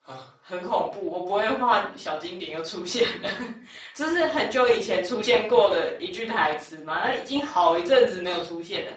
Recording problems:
off-mic speech; far
garbled, watery; badly; nothing above 7.5 kHz
thin; somewhat; fading below 500 Hz
room echo; slight; dies away in 0.4 s

